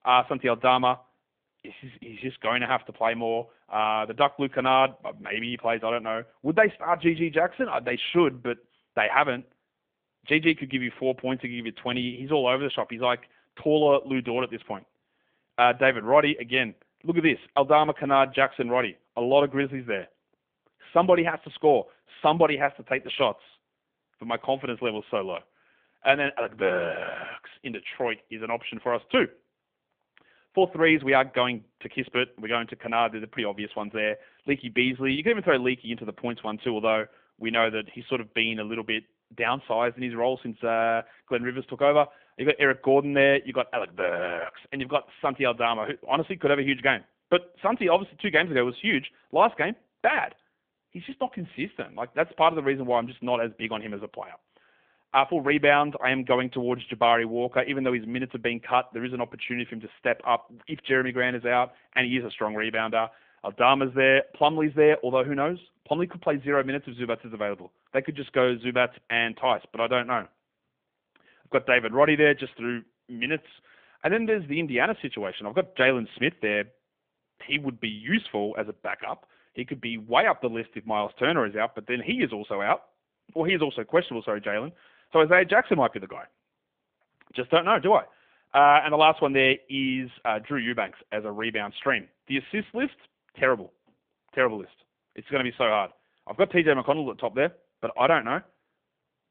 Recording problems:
phone-call audio; nothing above 3.5 kHz

